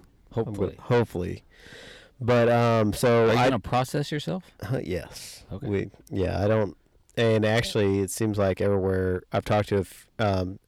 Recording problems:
distortion; heavy; 7 dB below the speech

